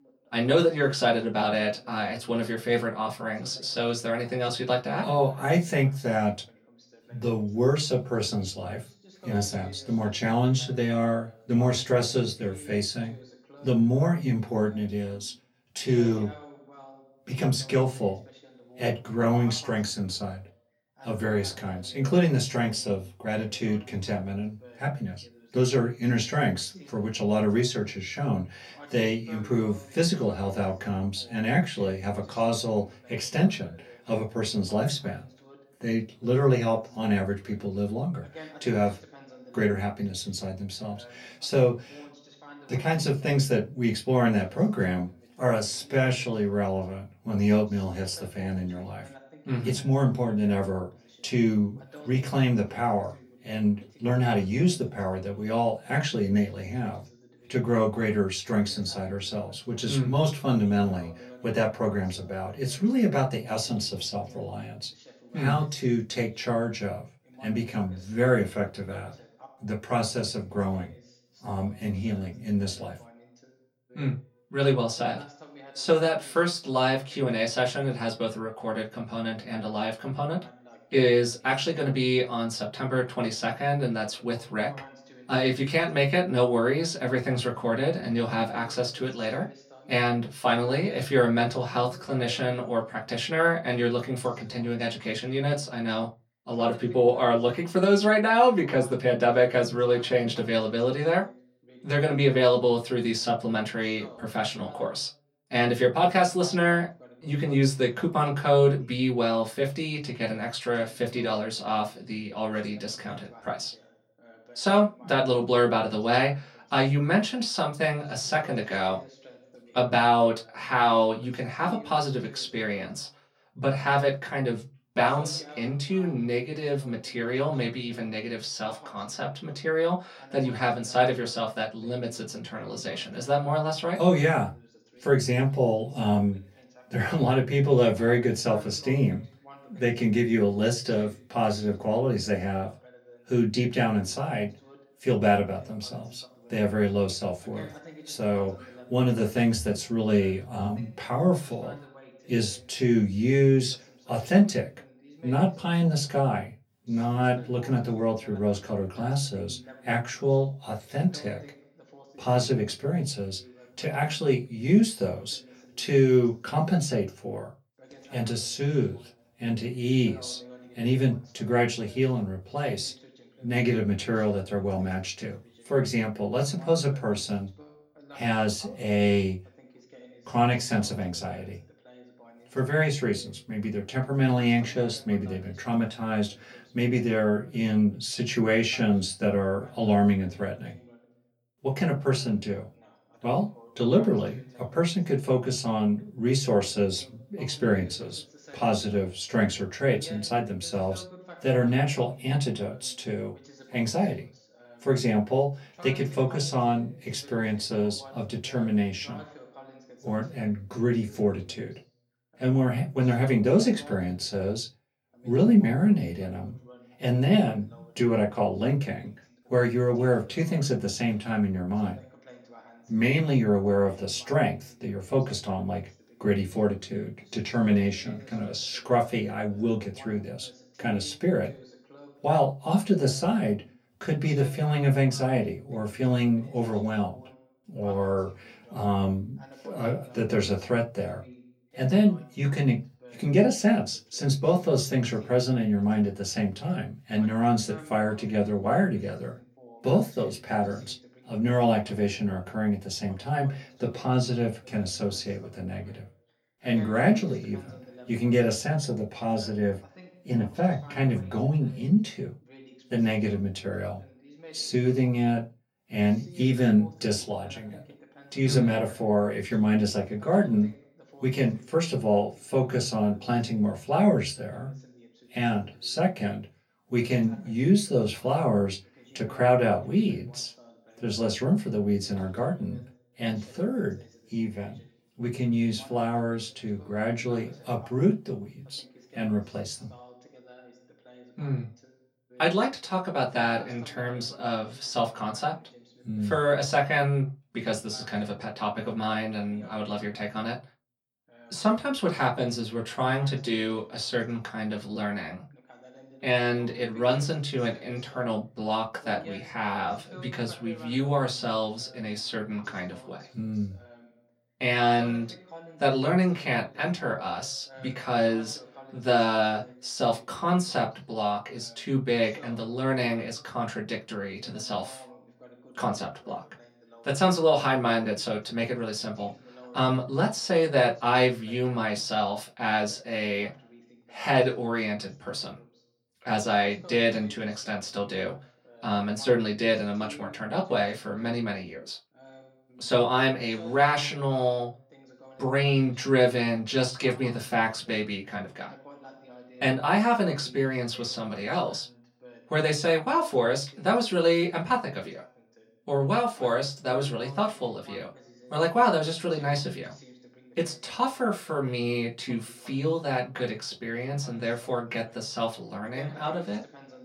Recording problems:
off-mic speech; far
room echo; very slight; dies away in 0.2 s
voice in the background; faint; throughout; 25 dB below the speech

